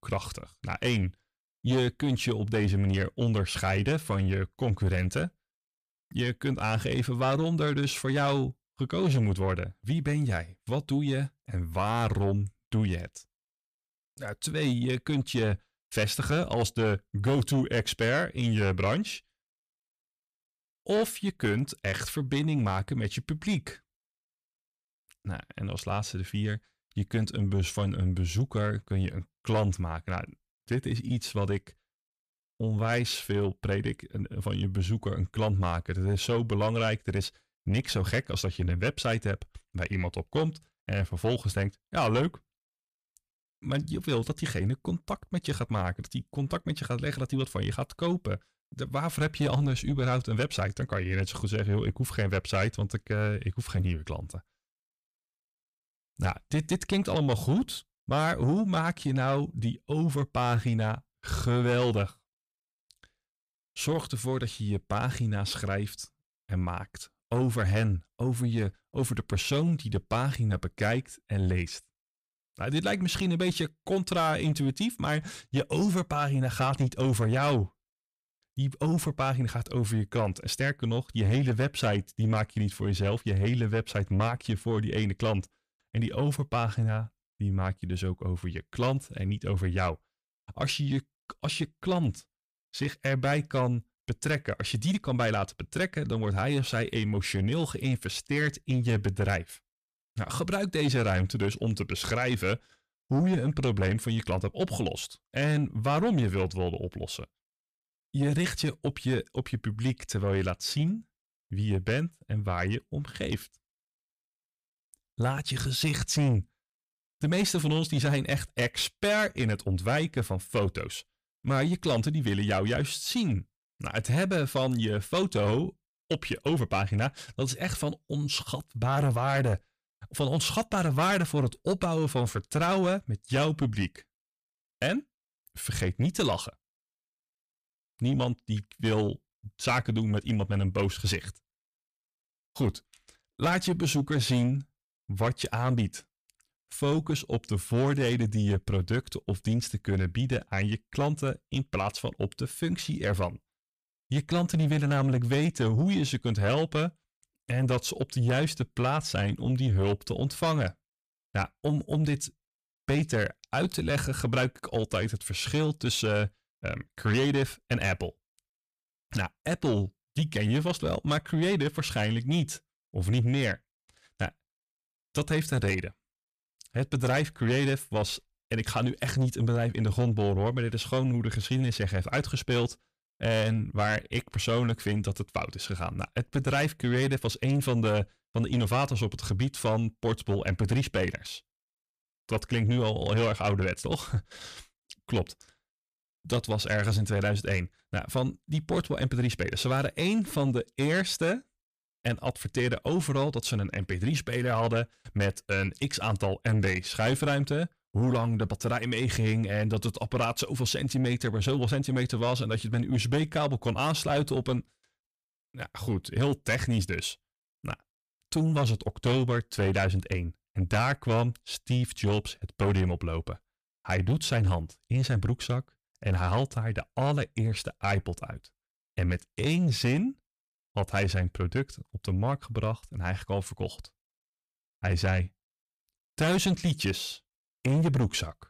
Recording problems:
distortion; slight; 10 dB below the speech

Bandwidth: 15 kHz